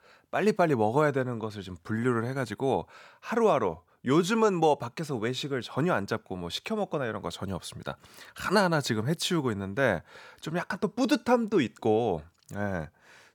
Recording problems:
none

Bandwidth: 18 kHz